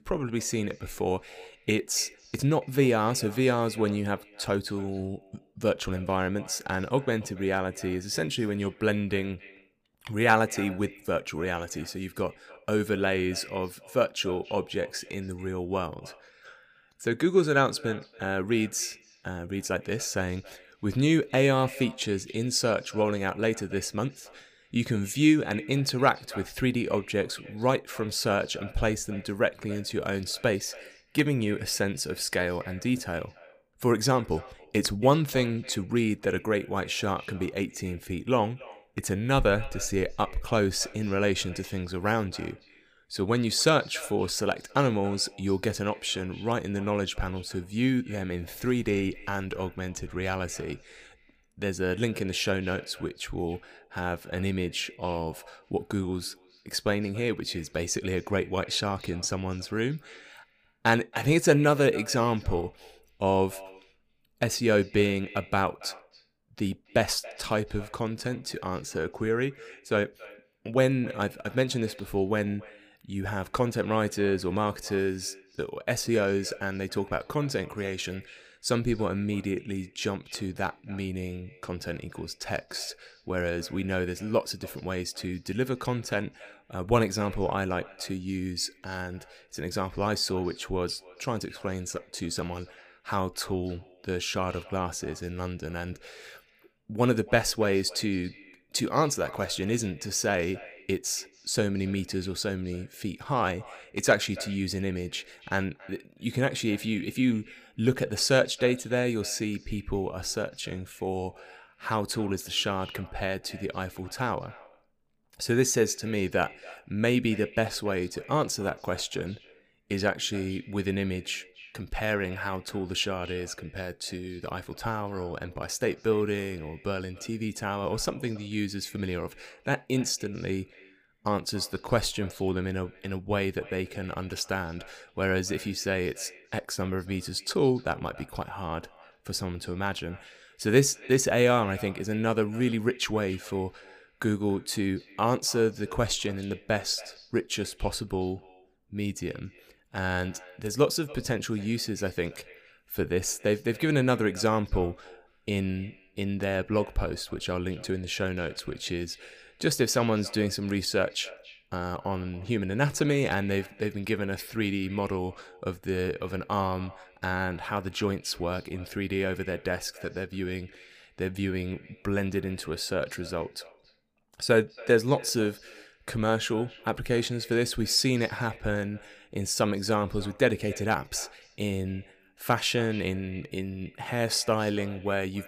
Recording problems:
echo of what is said; faint; throughout; 280 ms later, 20 dB below the speech

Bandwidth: 15 kHz